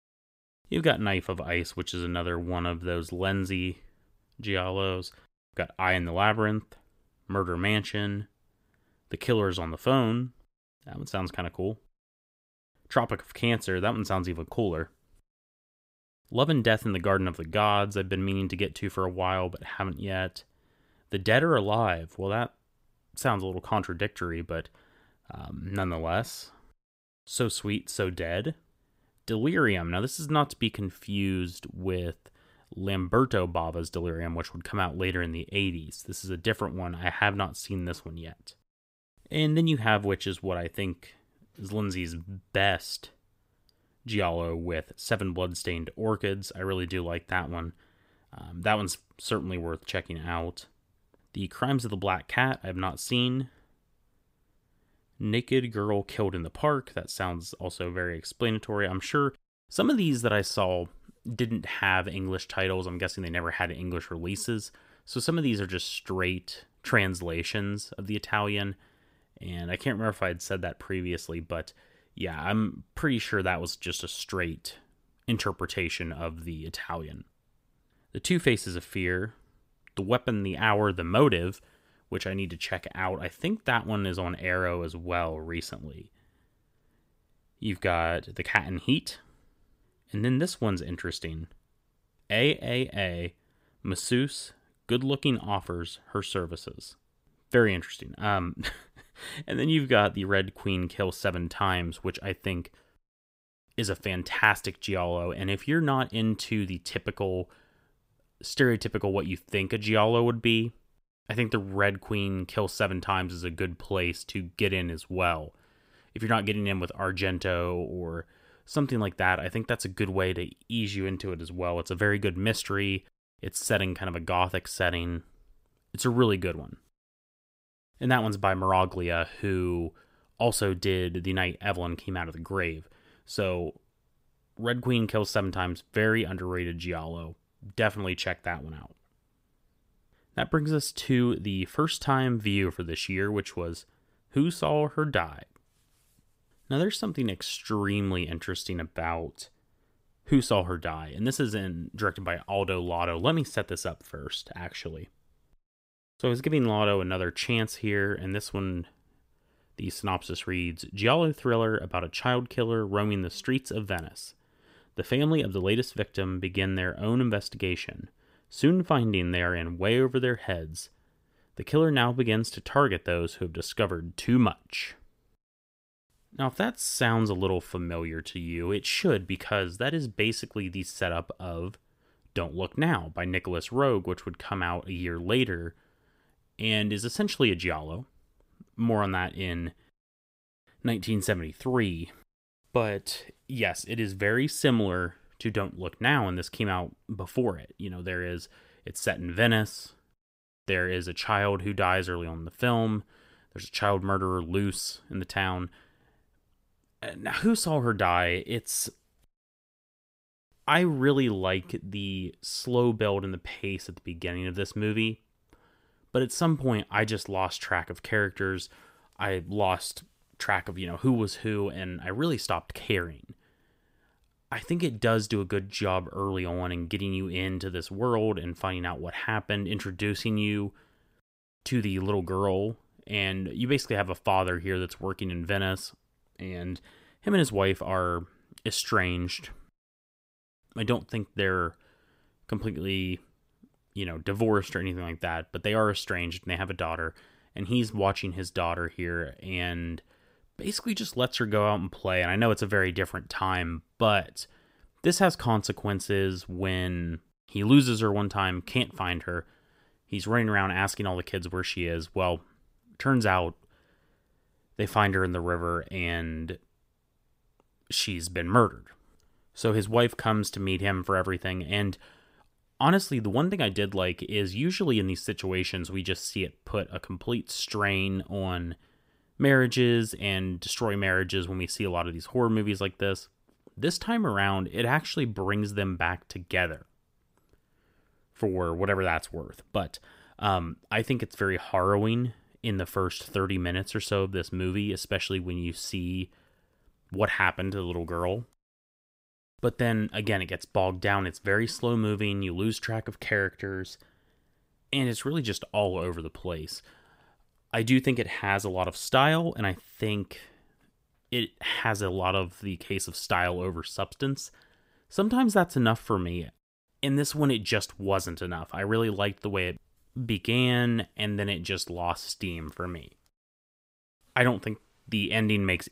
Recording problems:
none

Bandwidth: 15.5 kHz